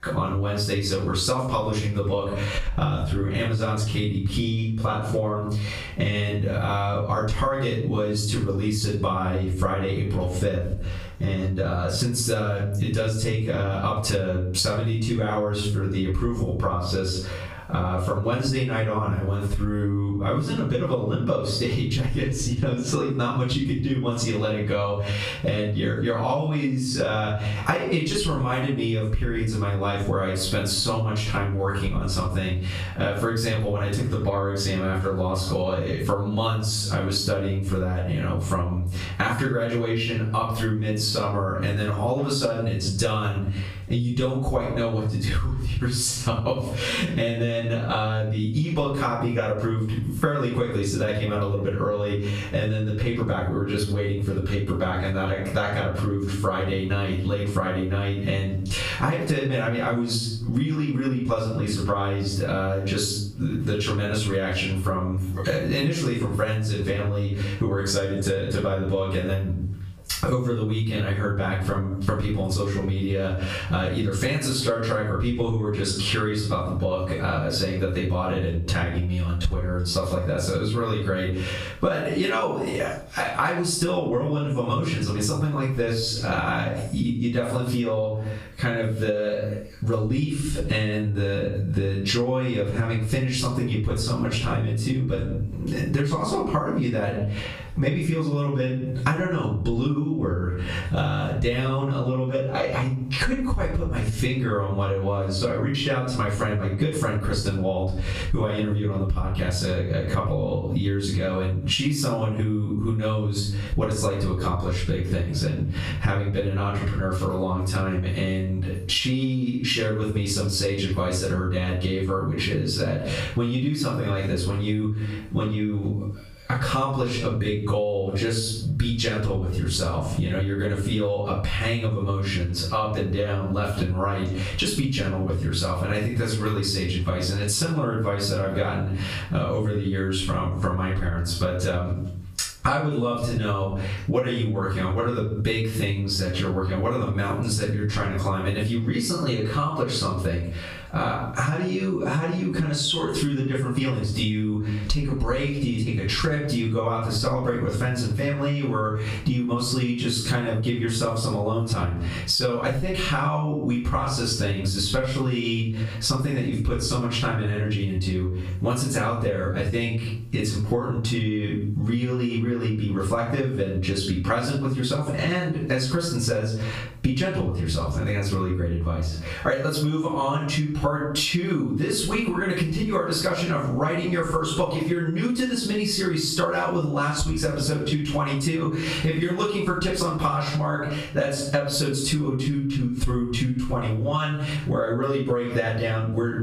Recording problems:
off-mic speech; far
squashed, flat; heavily
room echo; noticeable; dies away in 0.4 s

